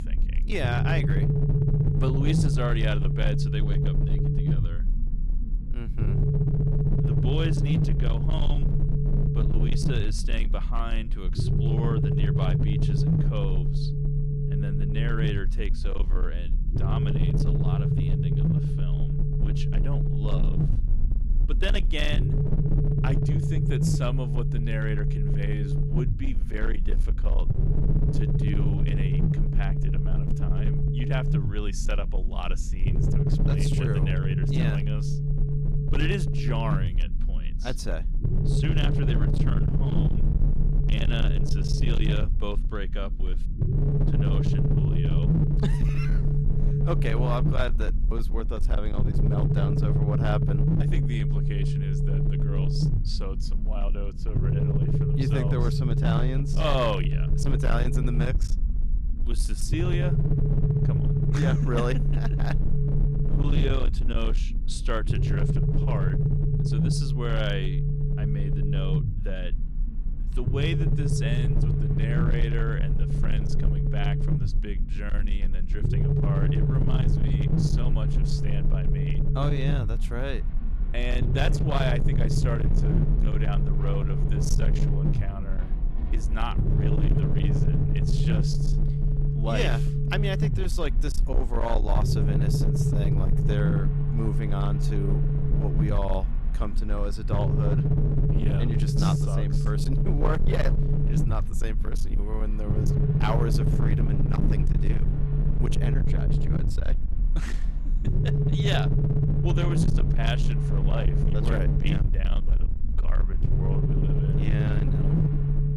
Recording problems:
distortion; slight; 15% of the sound clipped
low rumble; loud; throughout; 1 dB below the speech
train or aircraft noise; faint; throughout; 20 dB below the speech

